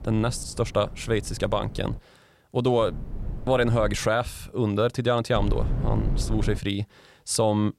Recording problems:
low rumble; noticeable; until 2 s, from 3 to 4 s and from 5.5 to 6.5 s; 20 dB below the speech

